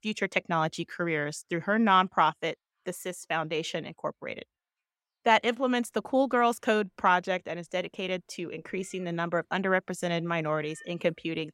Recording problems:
animal sounds; faint; throughout; 30 dB below the speech

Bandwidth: 16 kHz